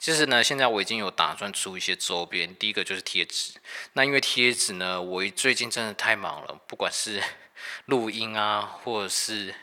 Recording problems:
thin; very; fading below 700 Hz
uneven, jittery; strongly; from 1 to 9 s

